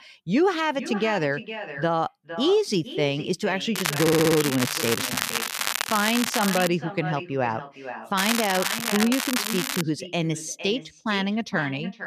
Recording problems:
echo of what is said; strong; throughout; 460 ms later, 10 dB below the speech
crackling; loud; from 4 to 6.5 s and from 8 to 10 s; 1 dB below the speech
audio stuttering; at 4 s

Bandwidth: 14.5 kHz